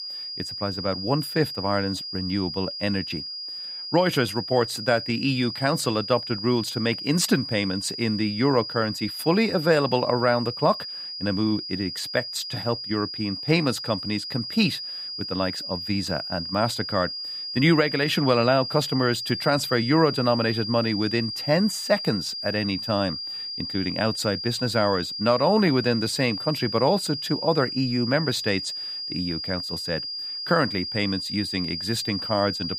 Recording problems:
high-pitched whine; loud; throughout; 5 kHz, 6 dB below the speech

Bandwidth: 15.5 kHz